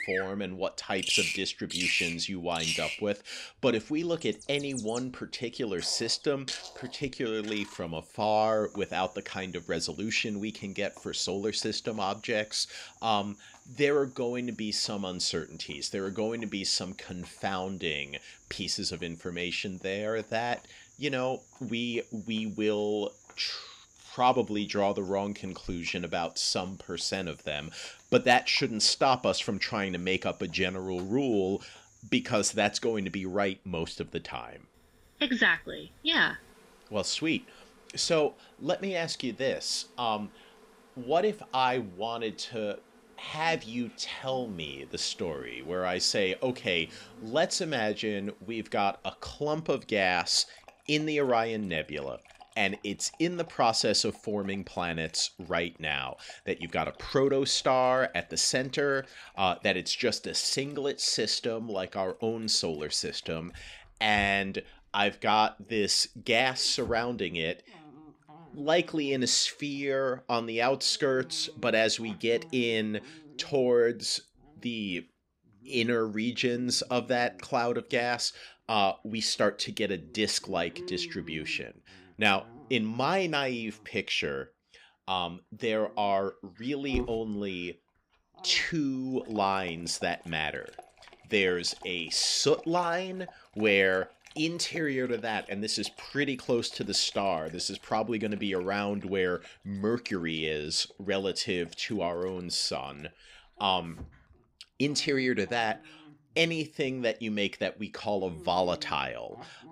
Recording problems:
animal sounds; noticeable; throughout; 15 dB below the speech

